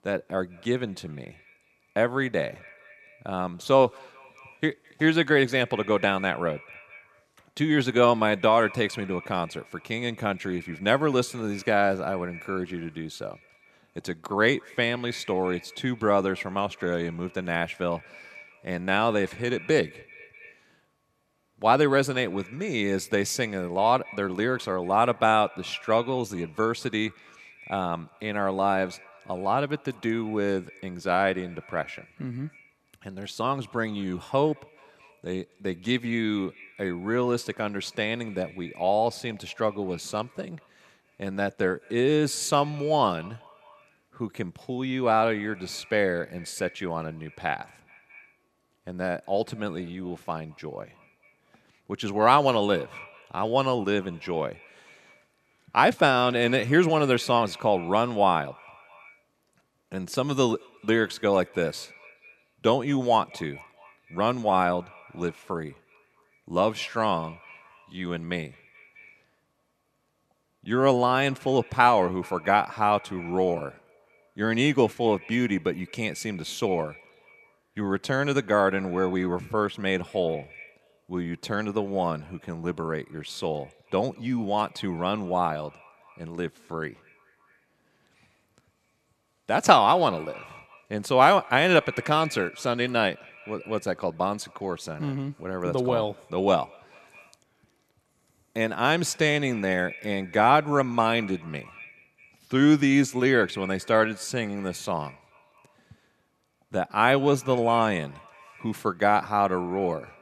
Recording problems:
echo of what is said; faint; throughout; 210 ms later, 20 dB below the speech

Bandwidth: 13.5 kHz